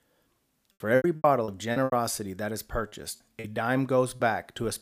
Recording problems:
choppy; very; 12% of the speech affected

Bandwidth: 15 kHz